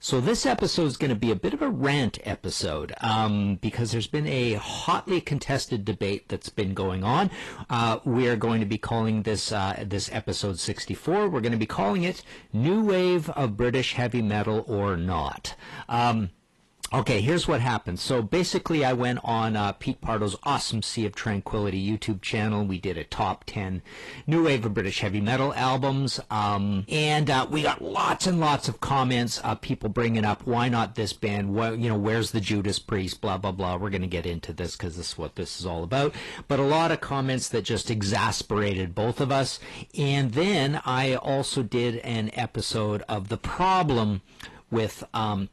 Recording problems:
distortion; slight; 10 dB below the speech
garbled, watery; slightly; nothing above 12 kHz

